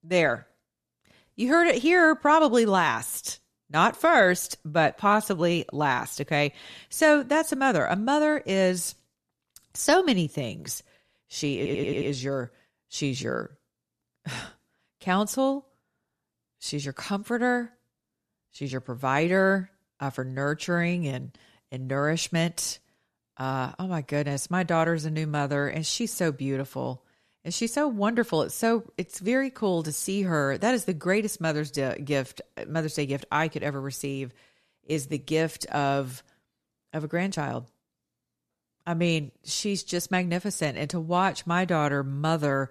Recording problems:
audio stuttering; at 12 s

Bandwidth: 13.5 kHz